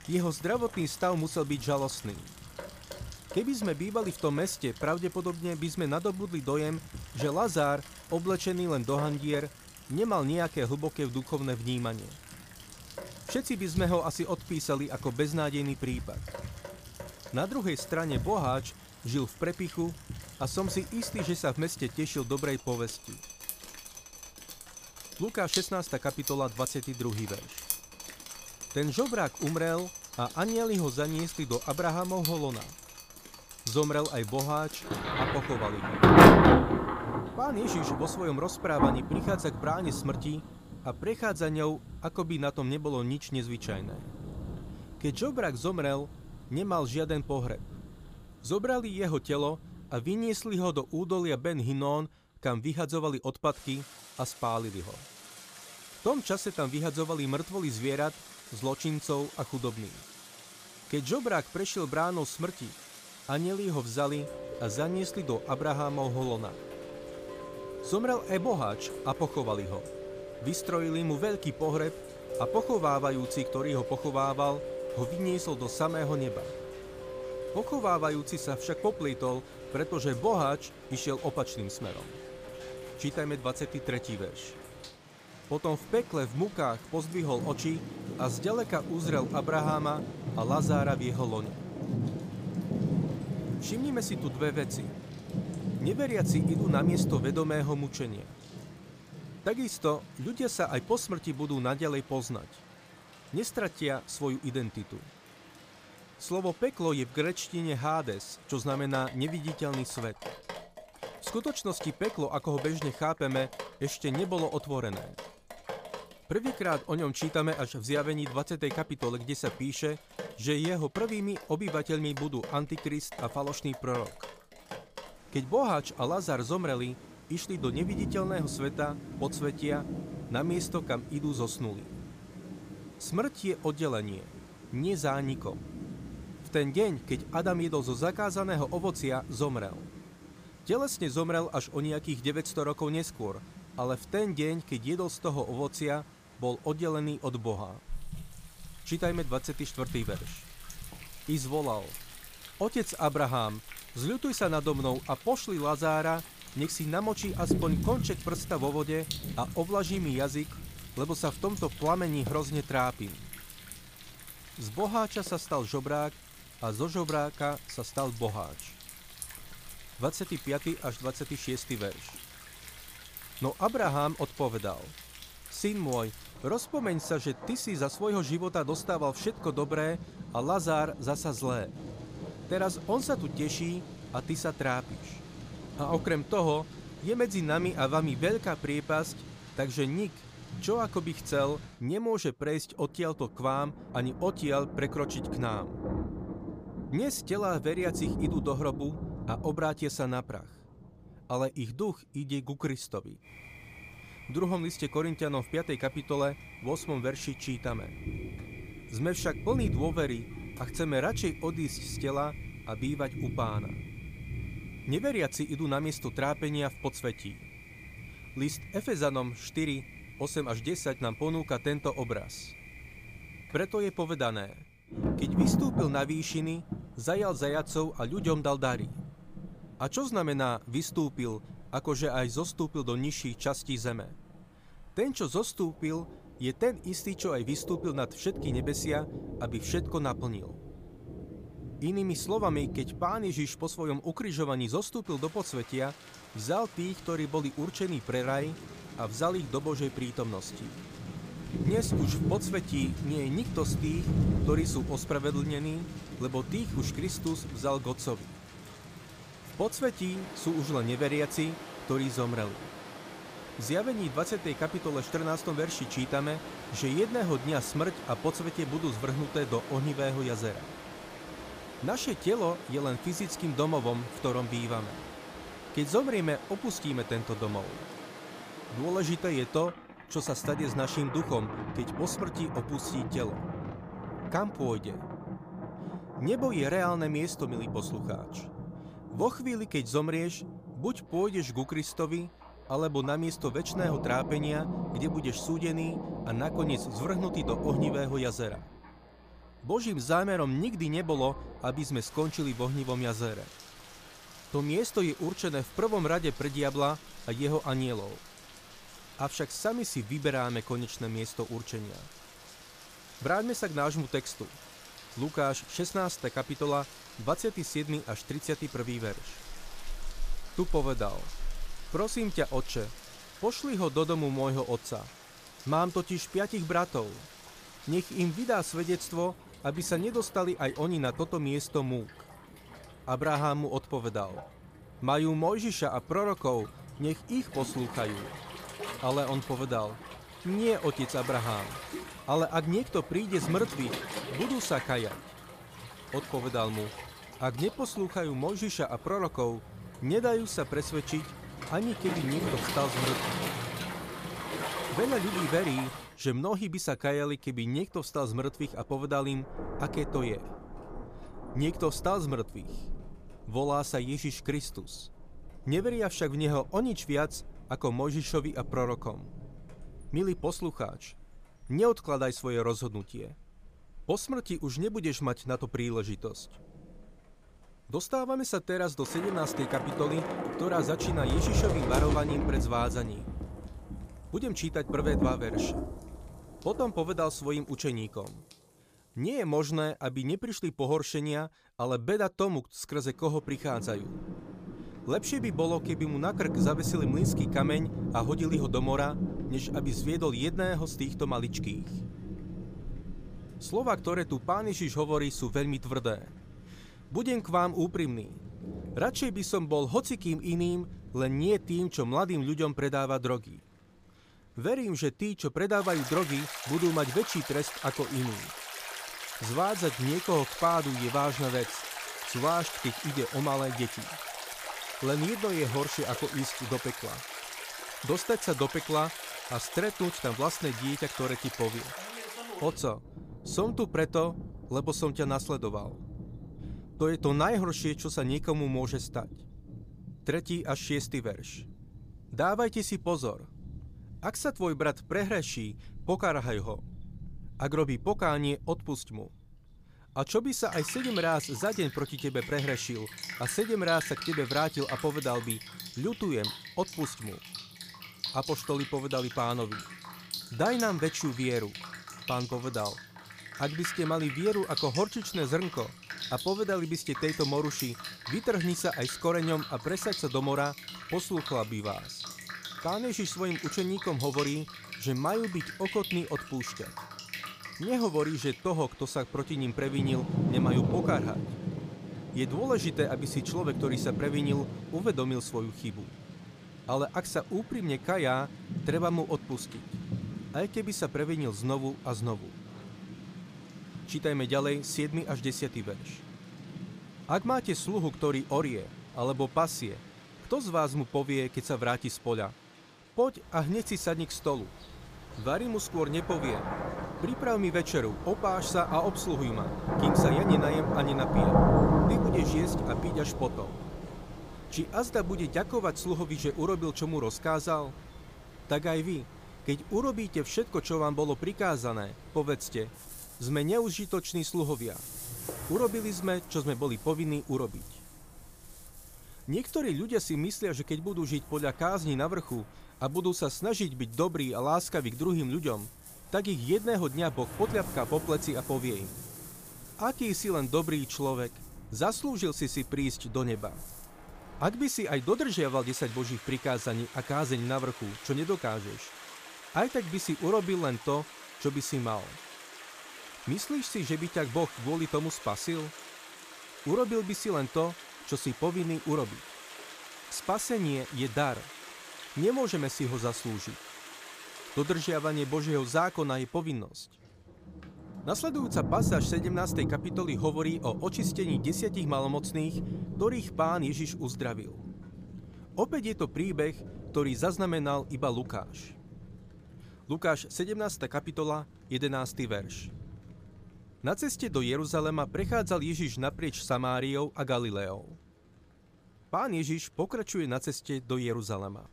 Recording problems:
rain or running water; loud; throughout; 6 dB below the speech

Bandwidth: 15 kHz